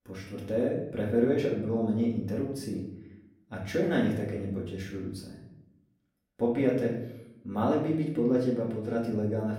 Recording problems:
off-mic speech; far
room echo; noticeable; dies away in 0.7 s

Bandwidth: 16 kHz